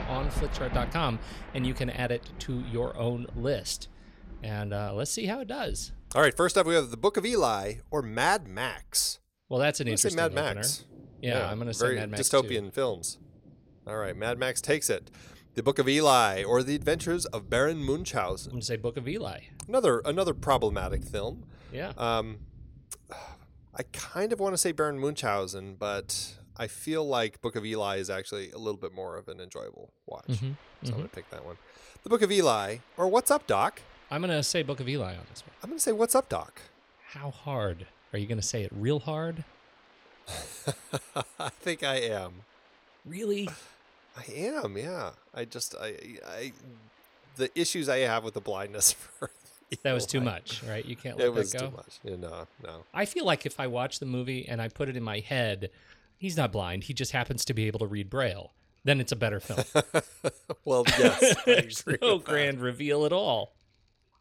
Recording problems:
rain or running water; noticeable; throughout; 20 dB below the speech

